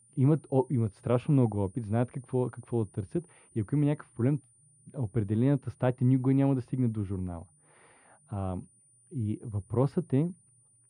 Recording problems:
muffled; very; fading above 3 kHz
high-pitched whine; faint; throughout; 9.5 kHz, 30 dB below the speech

